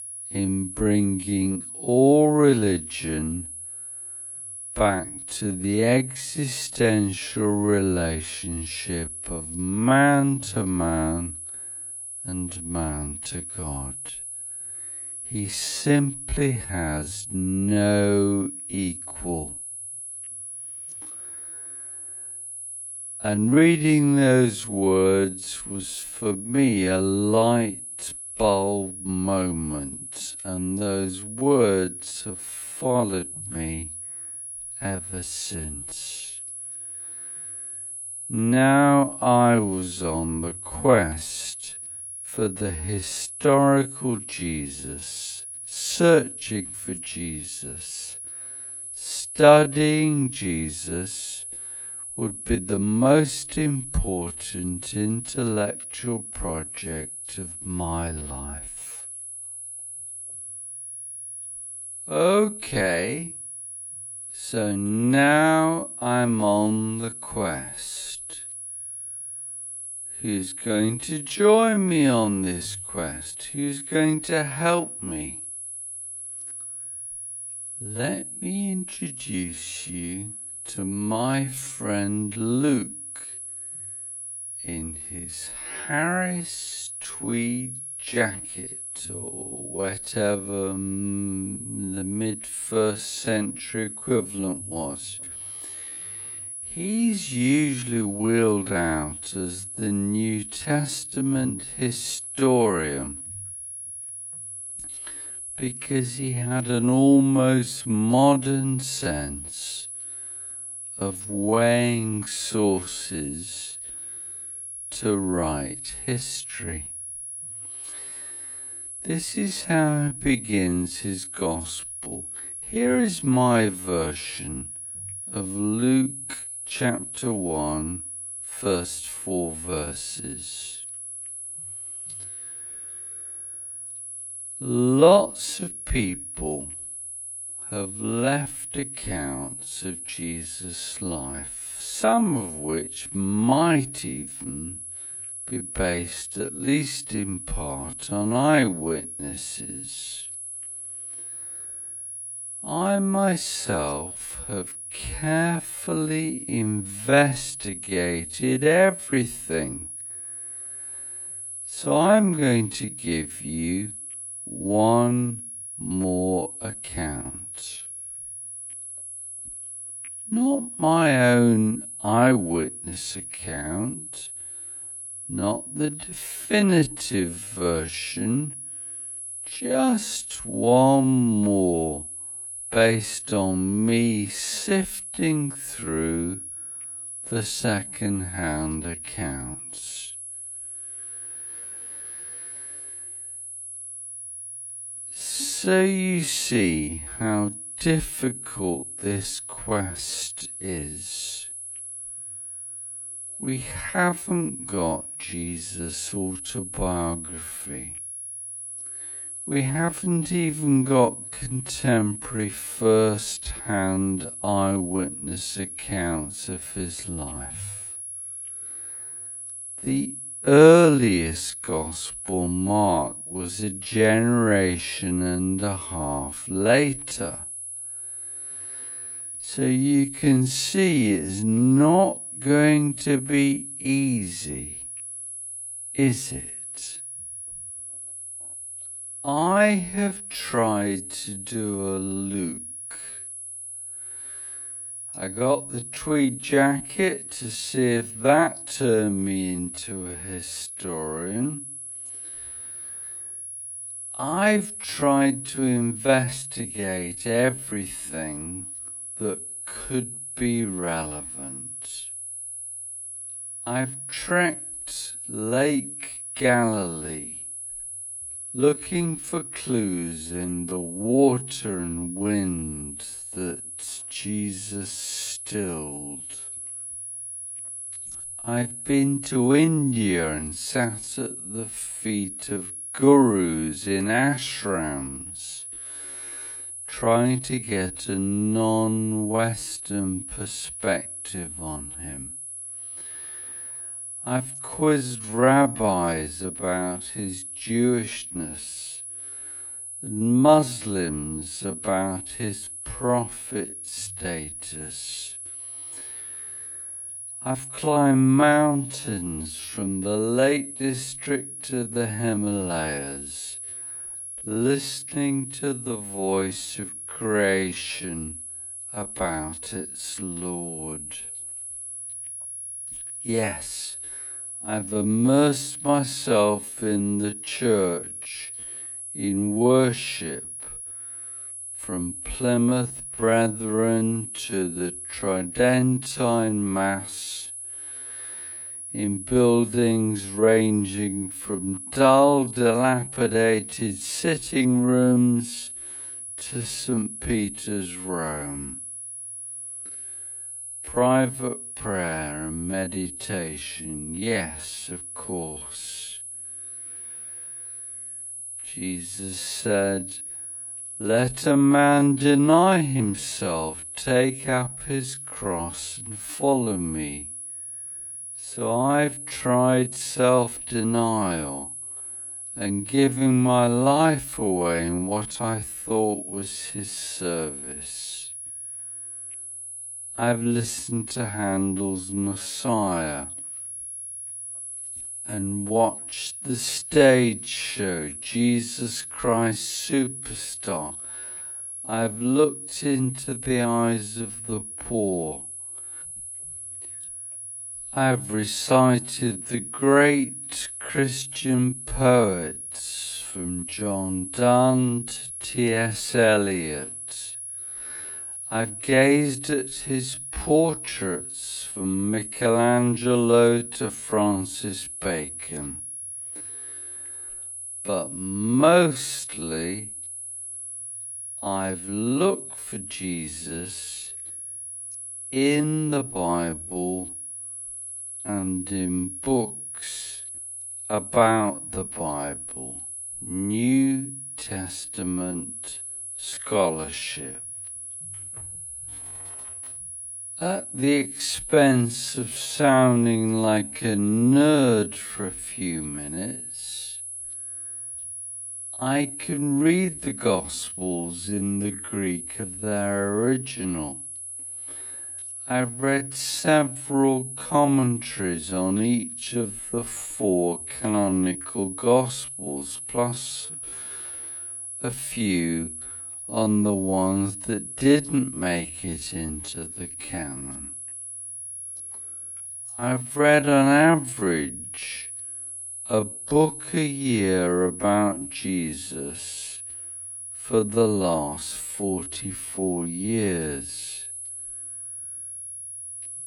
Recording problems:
wrong speed, natural pitch; too slow; 0.5 times normal speed
high-pitched whine; loud; throughout; 10.5 kHz, 9 dB below the speech

